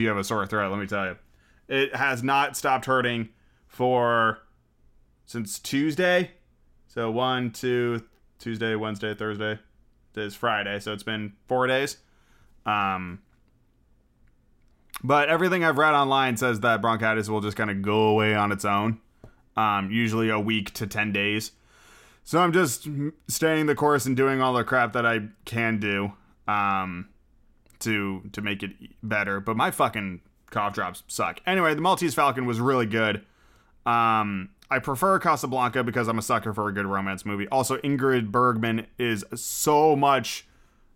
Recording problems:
abrupt cut into speech; at the start

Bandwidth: 16.5 kHz